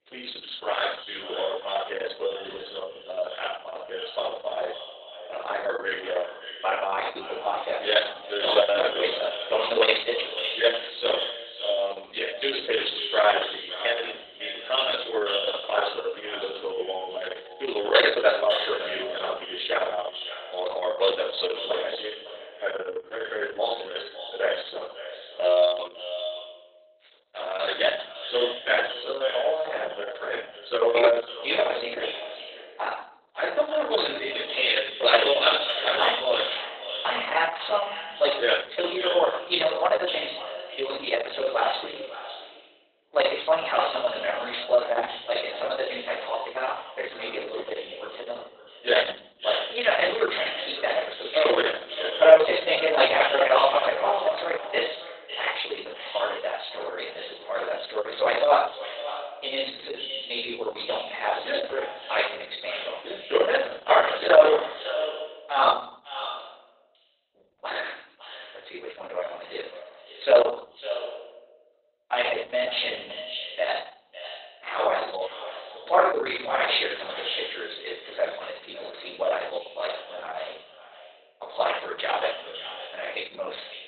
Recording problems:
echo of what is said; strong; throughout; 550 ms later, 9 dB below the speech
off-mic speech; far
garbled, watery; badly; nothing above 4 kHz
thin; very; fading below 450 Hz
room echo; noticeable; dies away in 0.5 s

